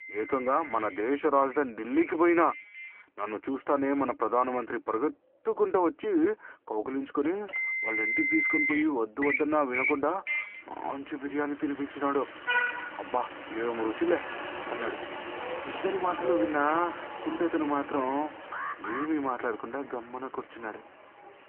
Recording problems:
phone-call audio
traffic noise; loud; throughout; 3 dB below the speech
alarm; noticeable; at 19 s; peak 5 dB below the speech

